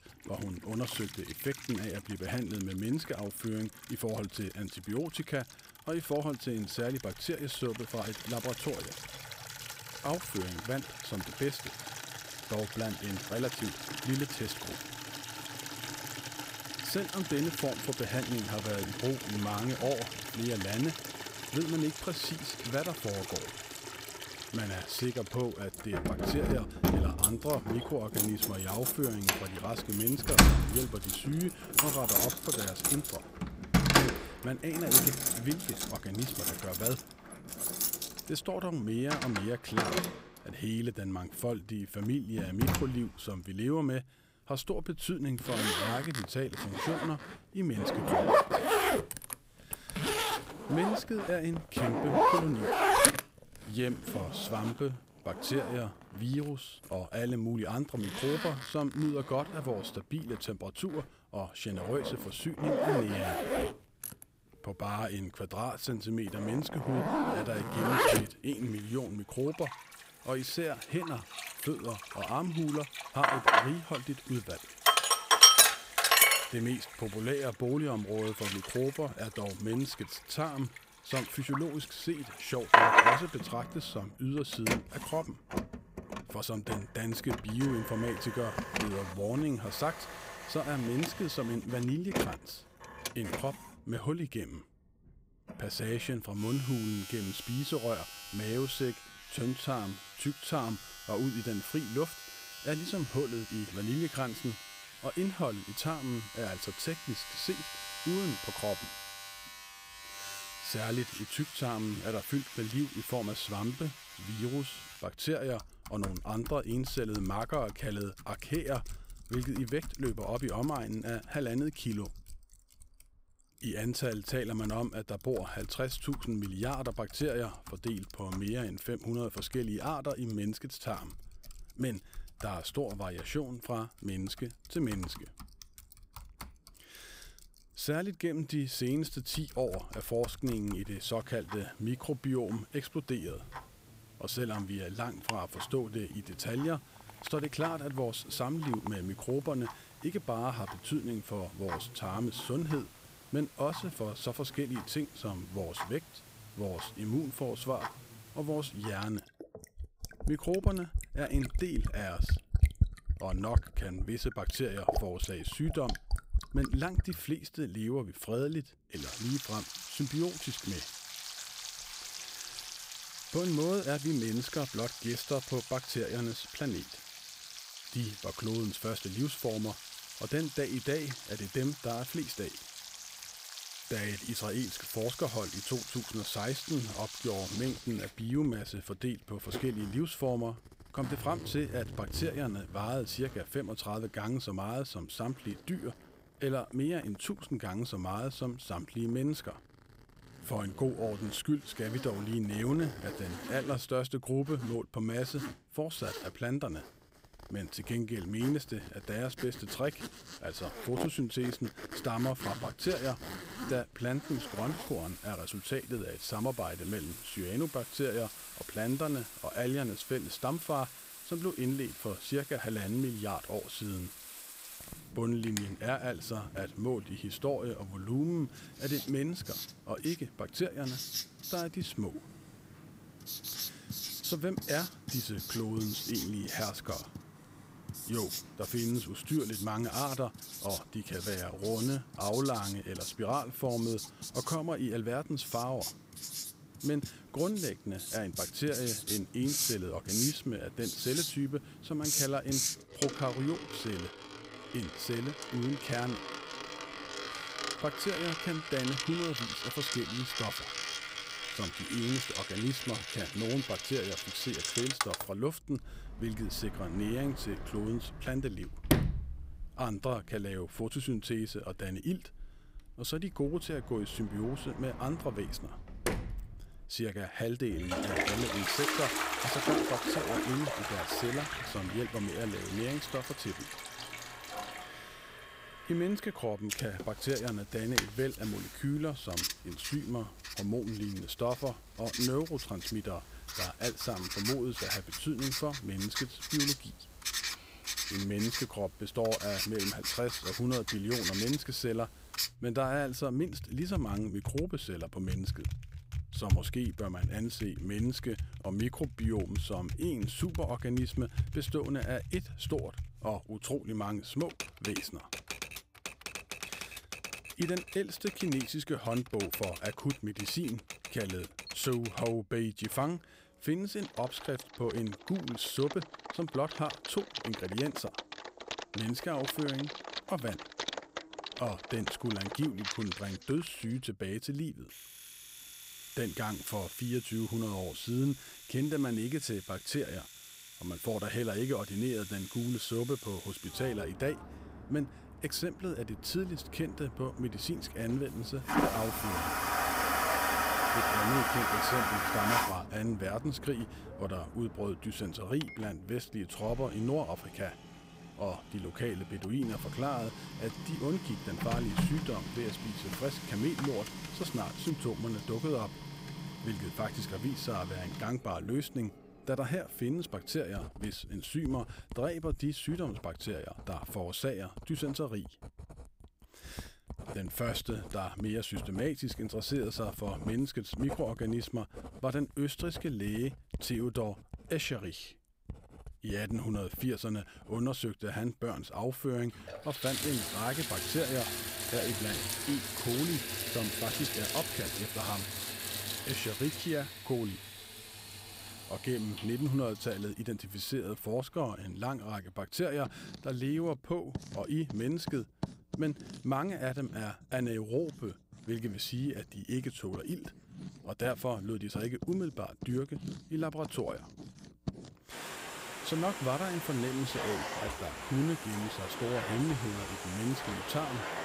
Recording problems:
household noises; very loud; throughout; 1 dB above the speech

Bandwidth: 15.5 kHz